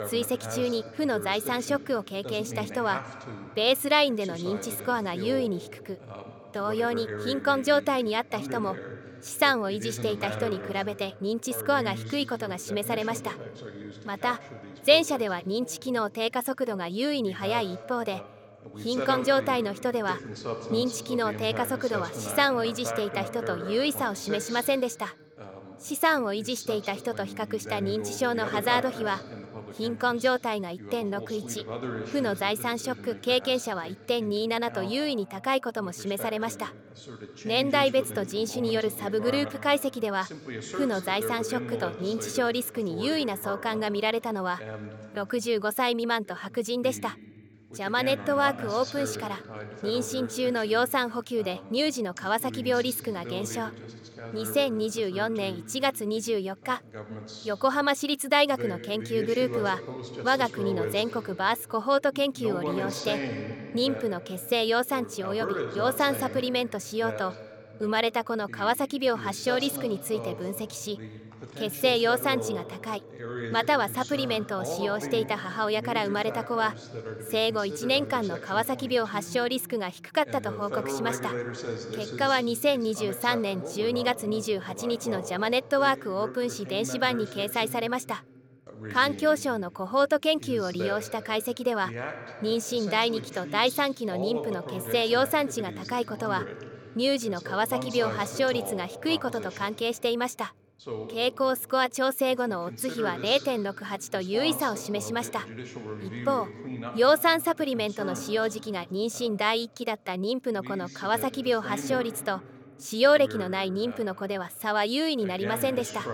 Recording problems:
voice in the background; noticeable; throughout; 10 dB below the speech

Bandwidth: 18 kHz